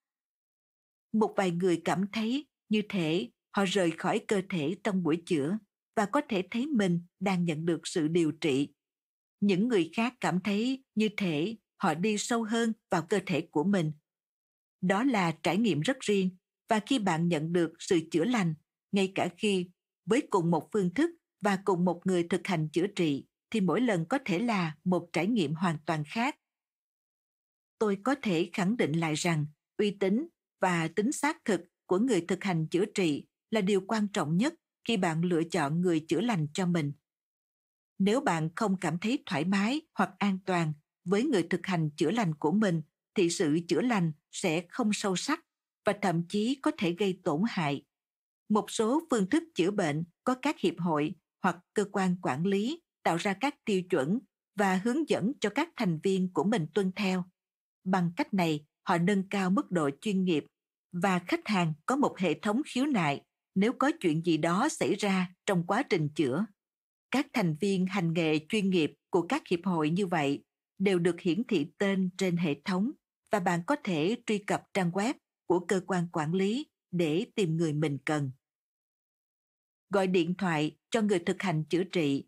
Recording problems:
none

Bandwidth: 15.5 kHz